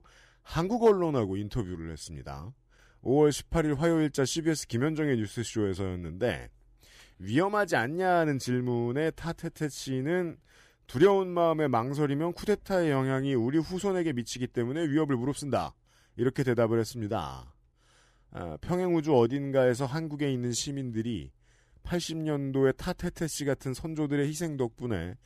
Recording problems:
none

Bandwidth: 14.5 kHz